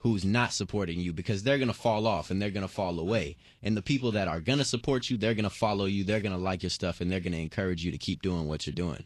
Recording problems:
garbled, watery; slightly; nothing above 11.5 kHz

